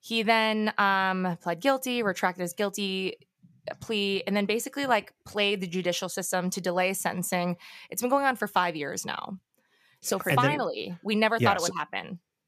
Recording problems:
none

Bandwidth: 14.5 kHz